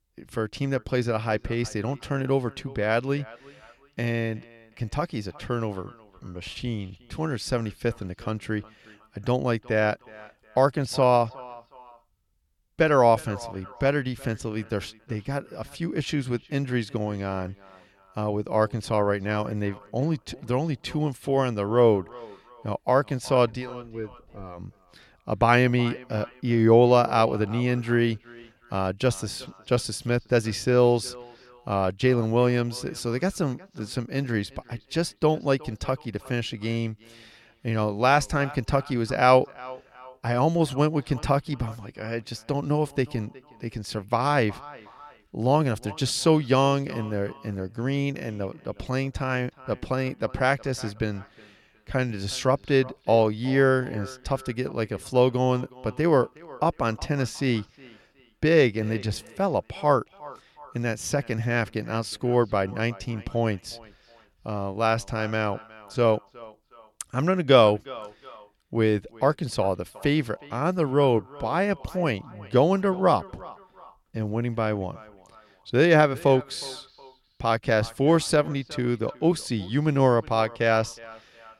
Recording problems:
echo of what is said; faint; throughout; 360 ms later, 20 dB below the speech

